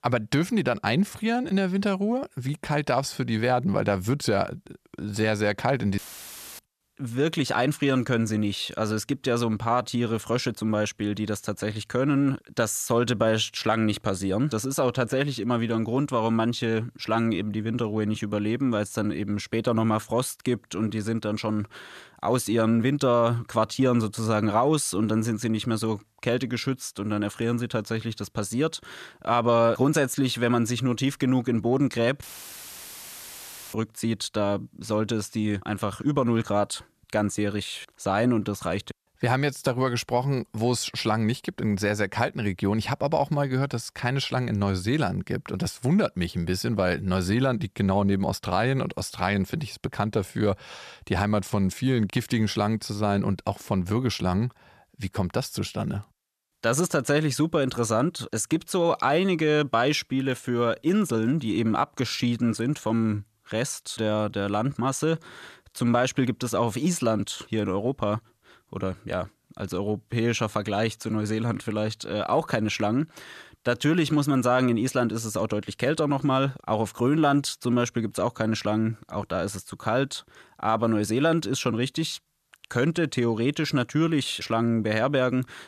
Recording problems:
audio cutting out; filled with static; at 6 s for 0.5 s and at 32 s for 1.5 s

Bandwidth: 14 kHz